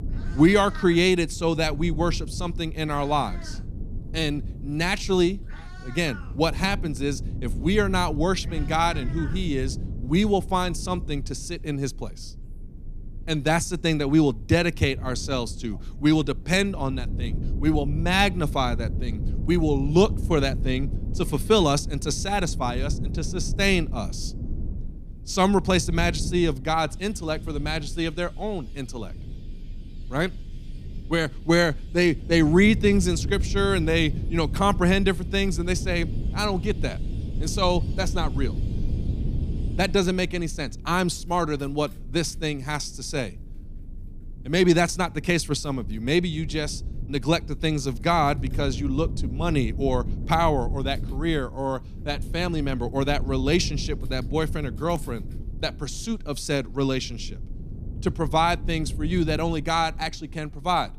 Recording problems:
low rumble; noticeable; throughout; 20 dB below the speech
animal sounds; faint; throughout; 25 dB below the speech

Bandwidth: 14.5 kHz